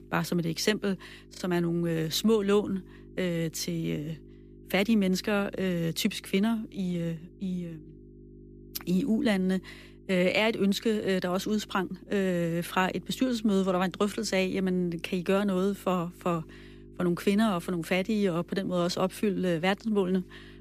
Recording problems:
electrical hum; faint; throughout; 50 Hz, 25 dB below the speech

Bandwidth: 14.5 kHz